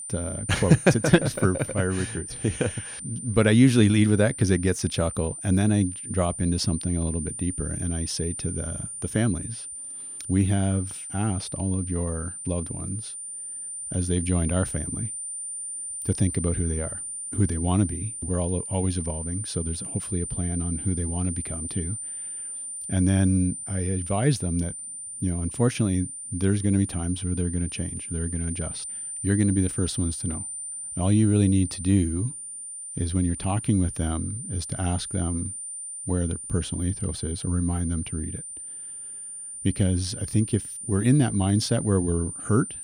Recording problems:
high-pitched whine; loud; throughout; 9 kHz, 7 dB below the speech

